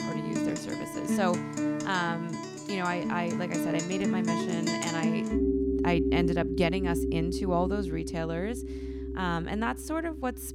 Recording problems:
background music; very loud; throughout; 1 dB above the speech

